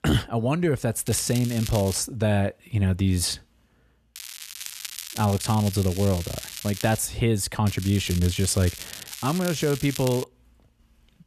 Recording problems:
crackling; noticeable; at 1 s, from 4 to 7 s and from 7.5 to 10 s; 10 dB below the speech

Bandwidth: 14 kHz